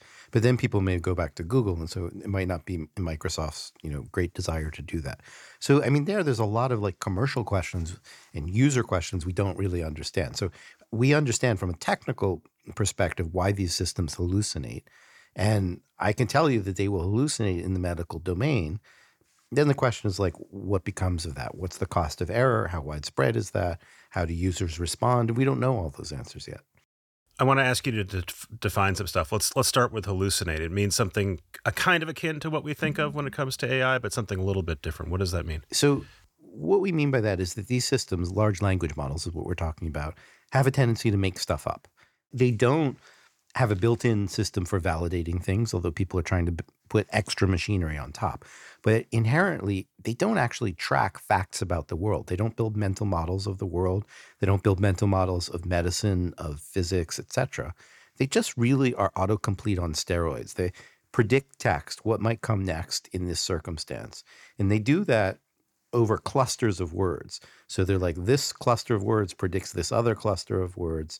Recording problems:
none

